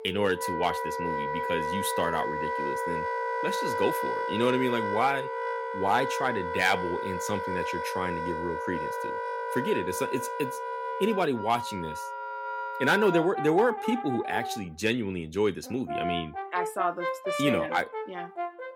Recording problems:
background music; loud; throughout; 3 dB below the speech

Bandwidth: 16 kHz